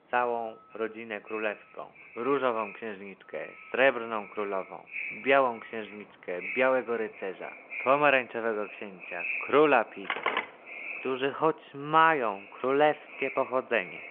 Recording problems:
echo of what is said; noticeable; throughout; 560 ms later, 15 dB below the speech
phone-call audio
traffic noise; faint; throughout; 25 dB below the speech
phone ringing; noticeable; at 10 s; peak 2 dB below the speech

